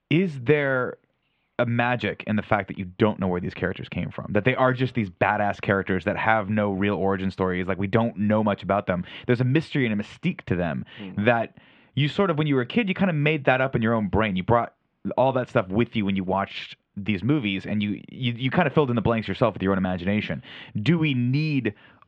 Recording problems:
muffled; very; fading above 3 kHz

